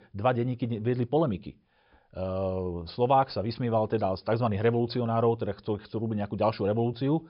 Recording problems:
high frequencies cut off; noticeable; nothing above 5.5 kHz

